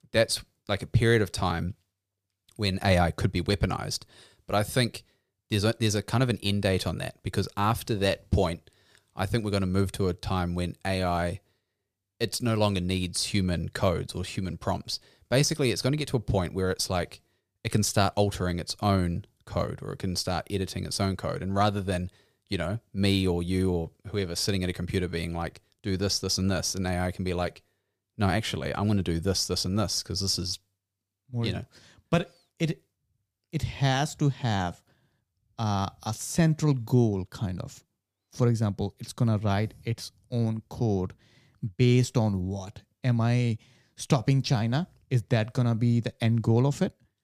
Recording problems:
none

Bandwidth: 15 kHz